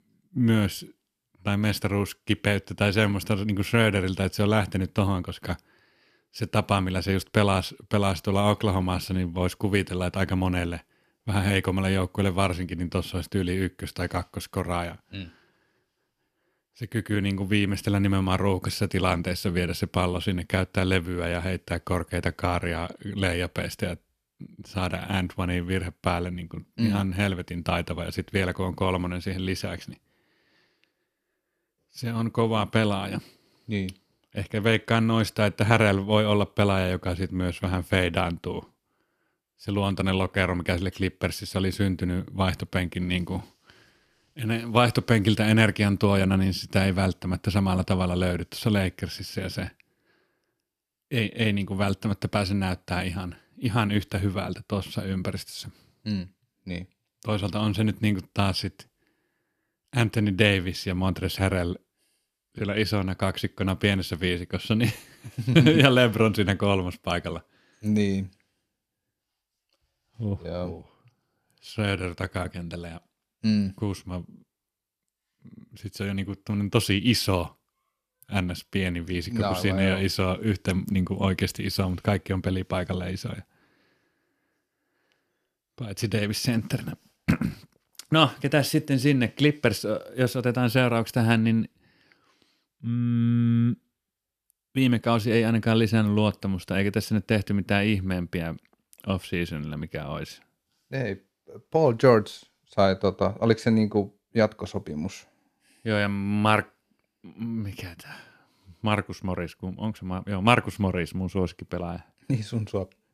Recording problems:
none

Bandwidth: 14.5 kHz